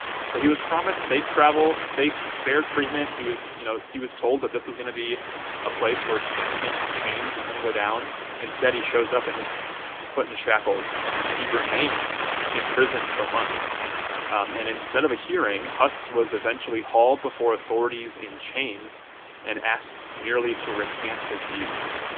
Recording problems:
phone-call audio; nothing above 3.5 kHz
wind noise on the microphone; heavy; 3 dB below the speech
murmuring crowd; faint; throughout; 20 dB below the speech

